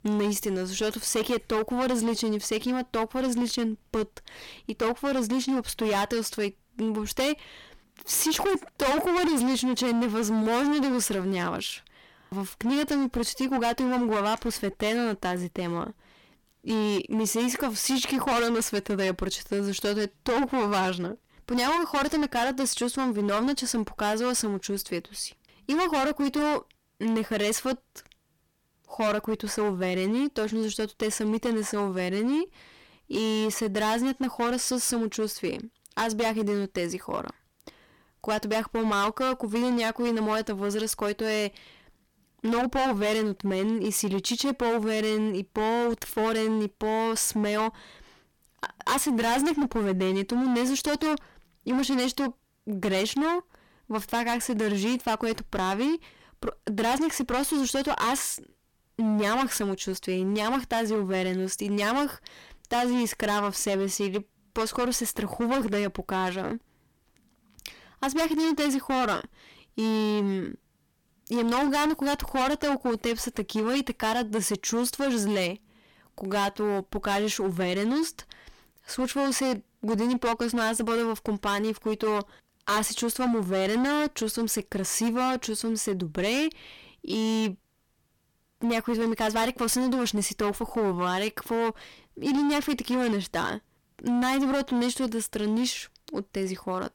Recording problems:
distortion; heavy; 17% of the sound clipped

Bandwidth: 17.5 kHz